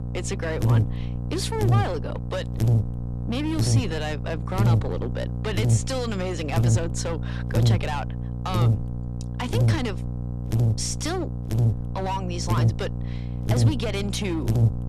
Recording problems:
distortion; slight; 10% of the sound clipped
electrical hum; loud; throughout; 60 Hz, 5 dB below the speech

